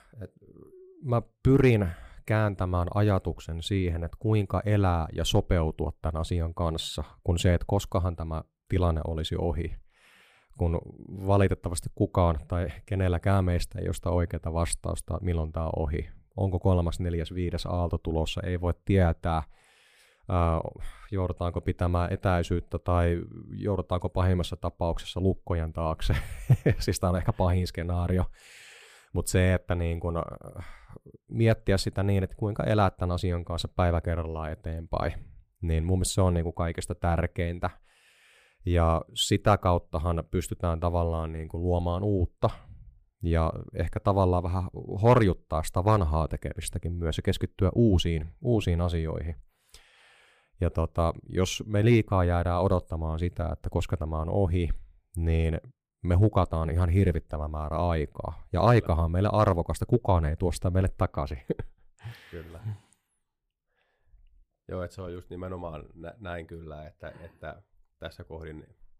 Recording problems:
none

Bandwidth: 15 kHz